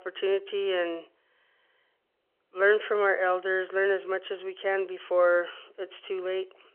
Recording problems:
phone-call audio

